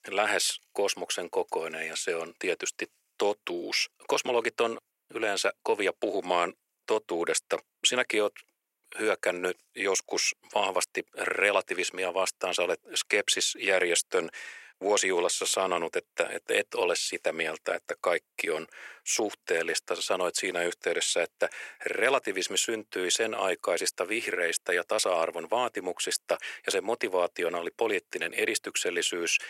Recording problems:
thin; very; fading below 400 Hz

